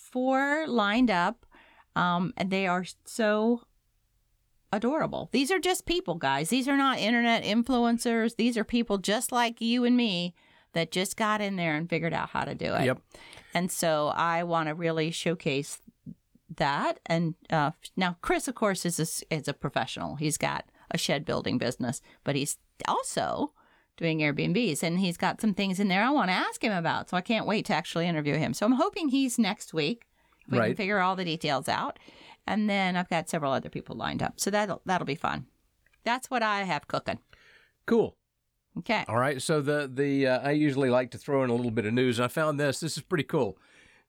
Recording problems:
none

